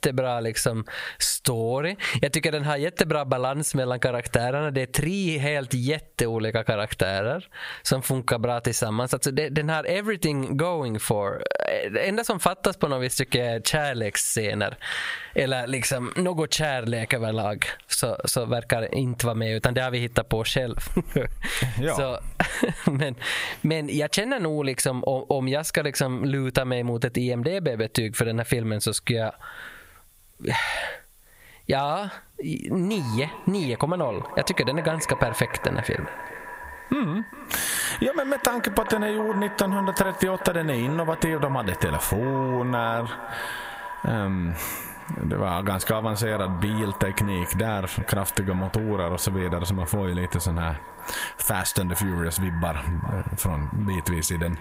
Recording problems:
echo of what is said; strong; from 33 s on; 410 ms later, 10 dB below the speech
squashed, flat; heavily

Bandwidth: 15.5 kHz